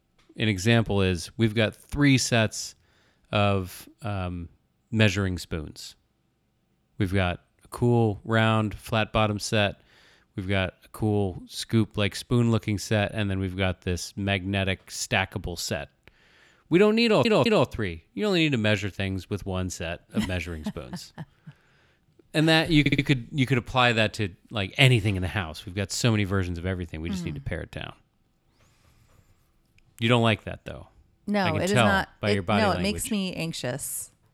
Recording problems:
audio stuttering; at 17 s and at 23 s

